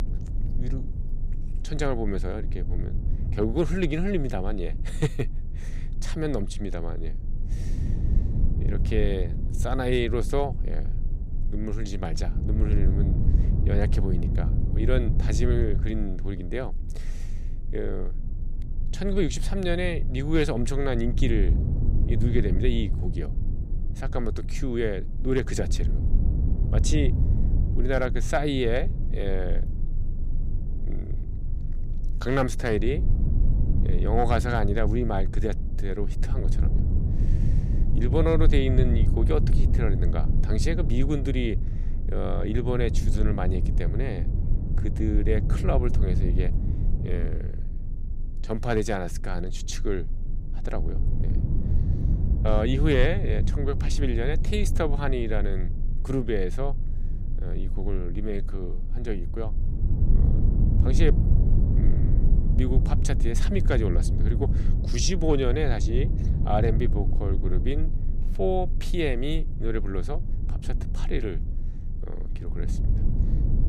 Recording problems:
low rumble; noticeable; throughout; 10 dB below the speech

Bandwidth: 15 kHz